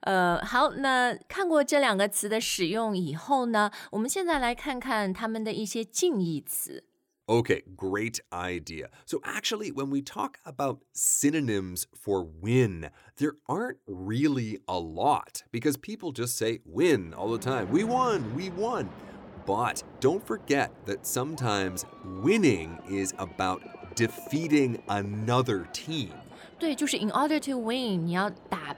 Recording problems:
train or aircraft noise; noticeable; from 17 s on; 20 dB below the speech

